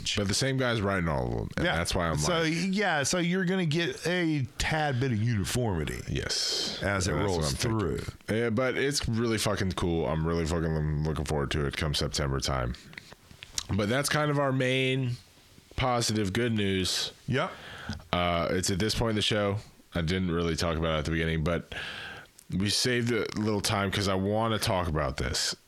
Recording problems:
squashed, flat; heavily

